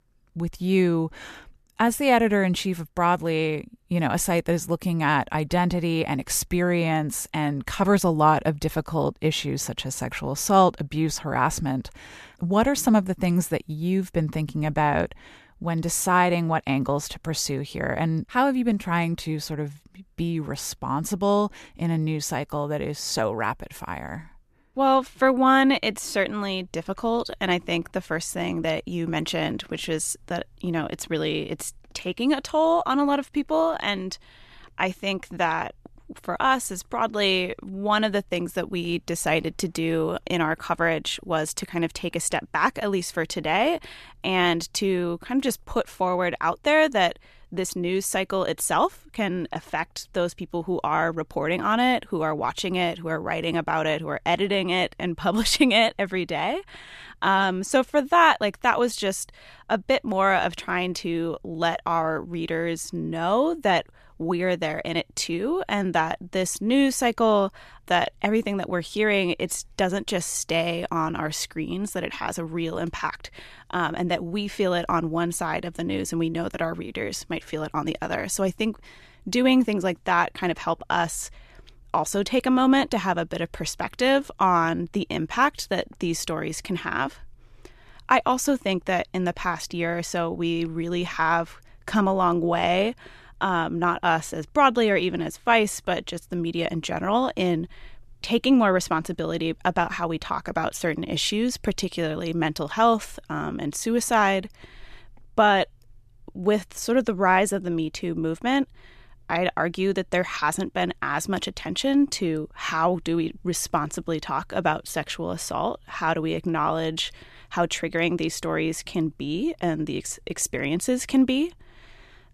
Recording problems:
none

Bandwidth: 14 kHz